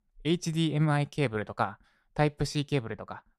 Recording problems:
none

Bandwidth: 14.5 kHz